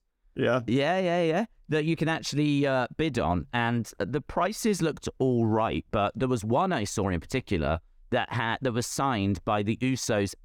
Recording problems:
none

